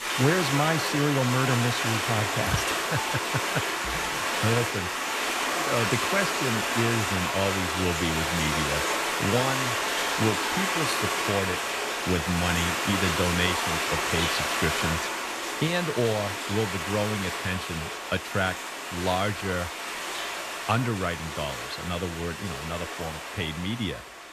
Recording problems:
rain or running water; very loud; throughout; 2 dB above the speech

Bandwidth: 14 kHz